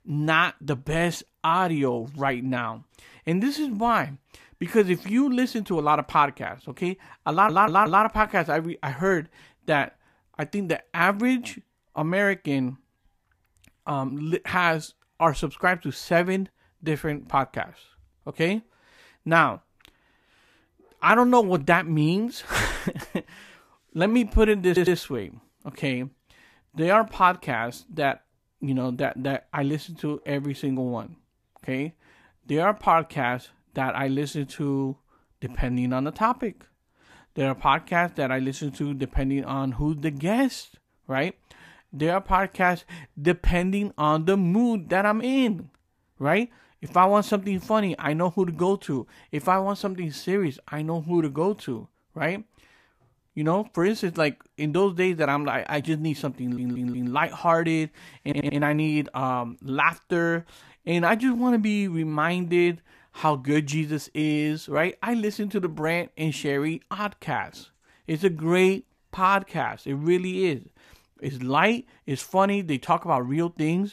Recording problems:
audio stuttering; 4 times, first at 7.5 s

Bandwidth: 14.5 kHz